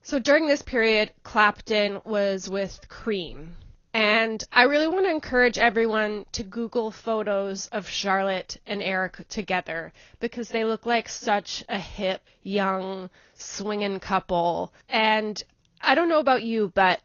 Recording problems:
garbled, watery; slightly; nothing above 6.5 kHz

